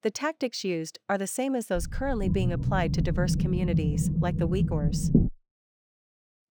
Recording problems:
low rumble; loud; from 2 to 5.5 s; 4 dB below the speech

